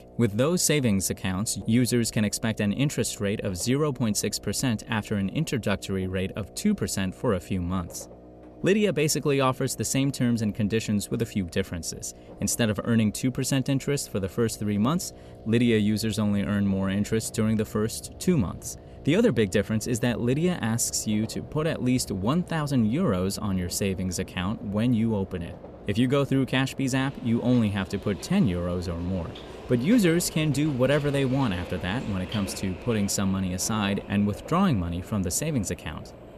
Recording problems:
electrical hum; noticeable; throughout; 60 Hz, 20 dB below the speech
train or aircraft noise; noticeable; throughout; 20 dB below the speech

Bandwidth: 14 kHz